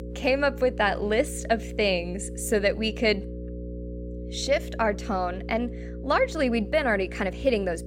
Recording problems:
electrical hum; noticeable; throughout; 60 Hz, 15 dB below the speech

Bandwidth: 16 kHz